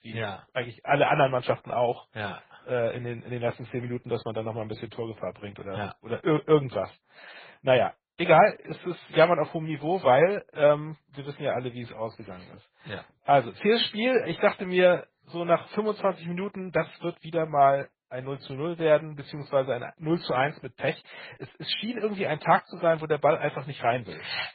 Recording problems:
garbled, watery; badly
high frequencies cut off; severe; nothing above 4.5 kHz

